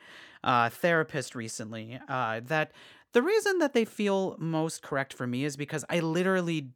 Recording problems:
none

